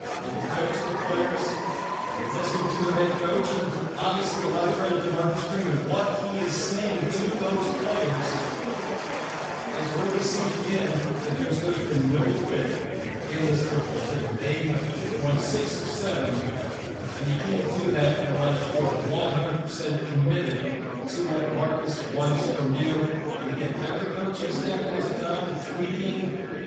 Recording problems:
room echo; strong; dies away in 1.3 s
off-mic speech; far
garbled, watery; badly; nothing above 7.5 kHz
echo of what is said; faint; throughout; 580 ms later, 20 dB below the speech
murmuring crowd; loud; throughout; 4 dB below the speech

